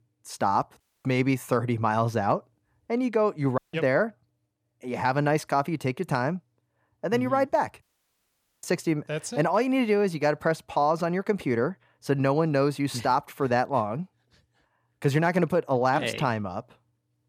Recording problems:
audio cutting out; at 1 s, at 3.5 s and at 8 s for 1 s

